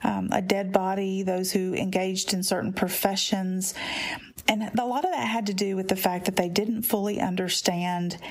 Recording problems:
squashed, flat; heavily

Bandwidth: 15.5 kHz